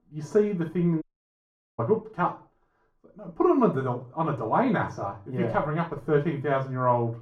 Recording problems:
off-mic speech; far
muffled; very; fading above 1.5 kHz
room echo; slight; dies away in 0.3 s
audio cutting out; at 1 s for 1 s

